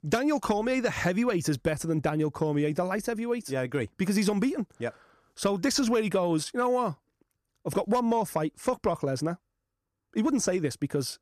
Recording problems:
none

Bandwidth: 14.5 kHz